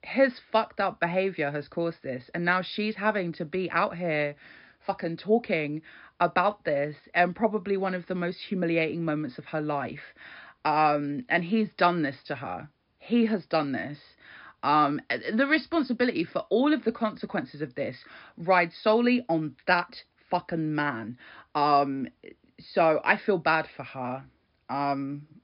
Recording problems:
high frequencies cut off; noticeable; nothing above 5.5 kHz

